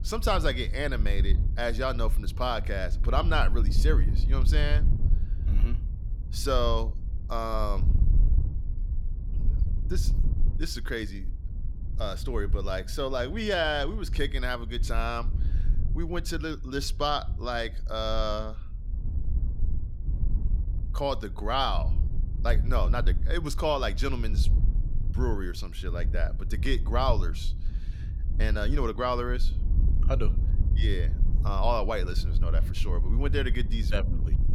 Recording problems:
wind noise on the microphone; occasional gusts; 15 dB below the speech

